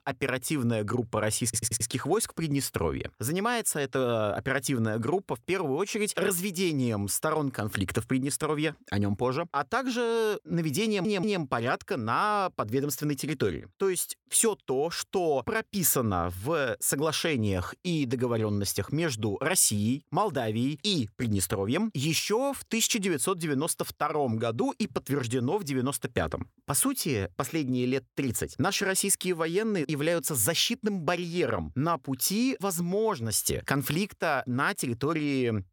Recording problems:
audio stuttering; at 1.5 s and at 11 s

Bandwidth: 18 kHz